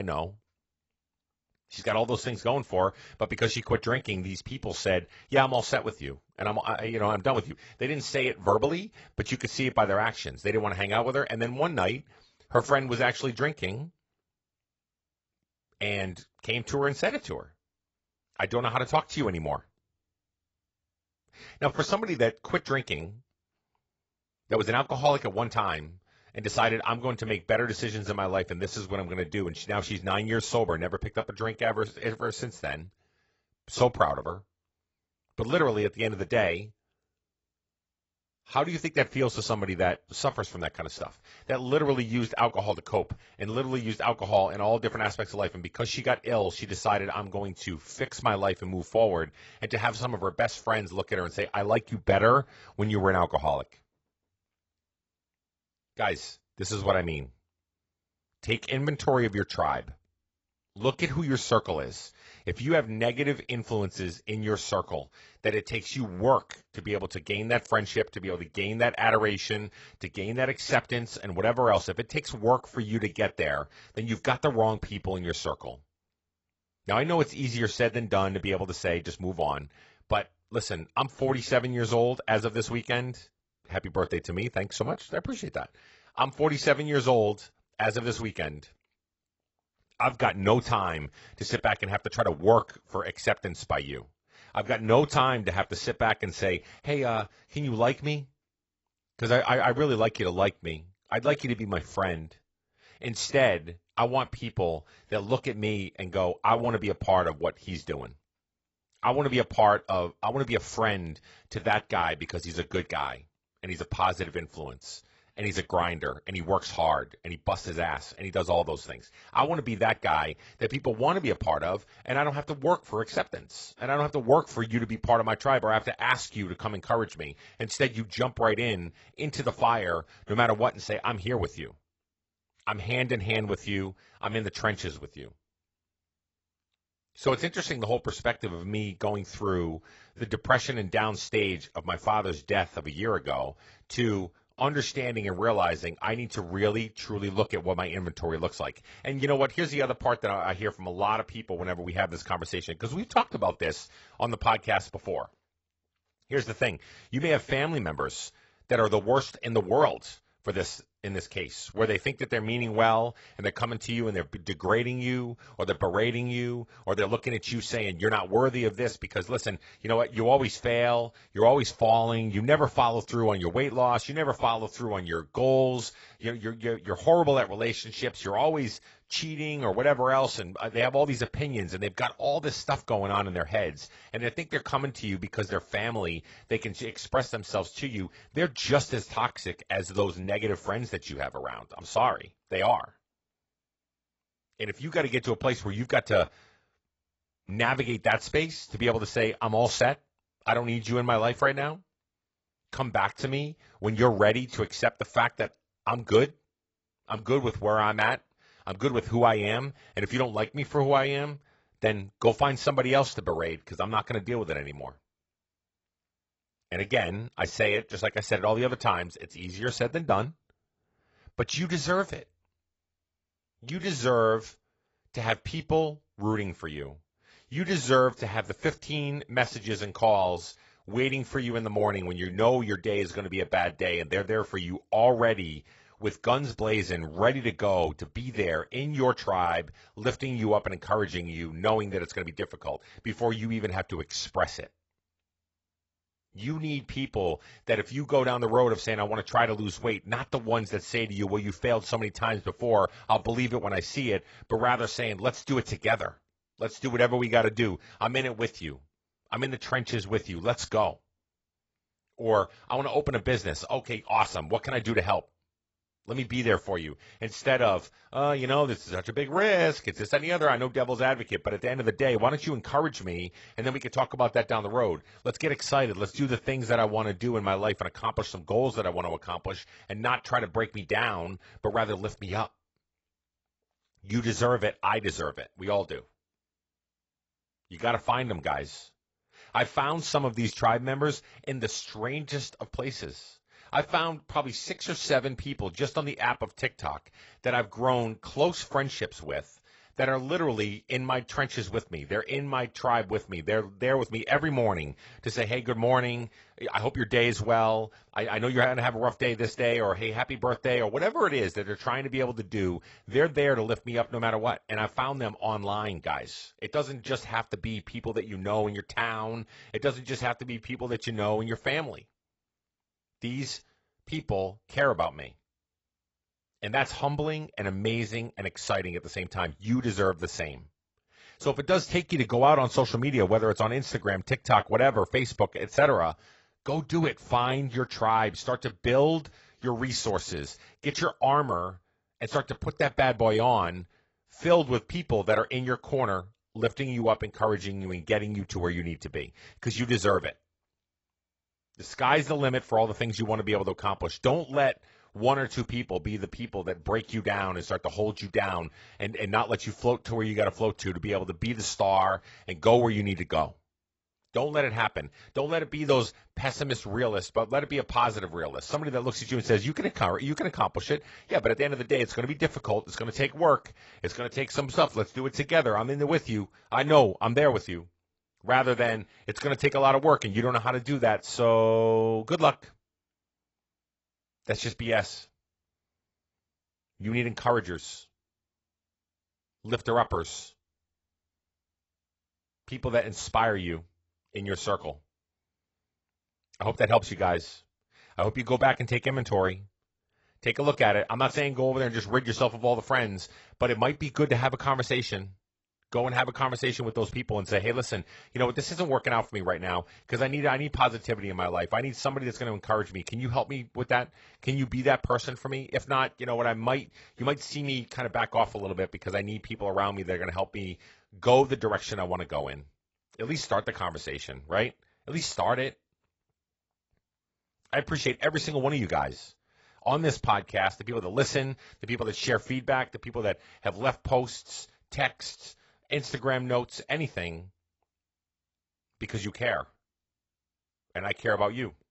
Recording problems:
garbled, watery; badly; nothing above 7.5 kHz
abrupt cut into speech; at the start

